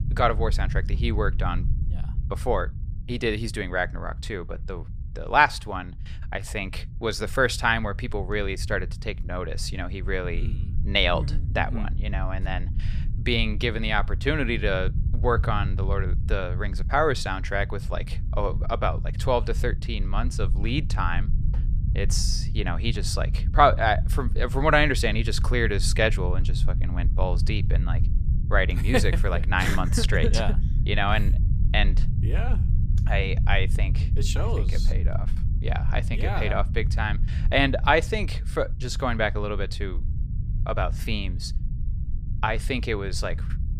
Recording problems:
low rumble; noticeable; throughout; 20 dB below the speech

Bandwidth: 15 kHz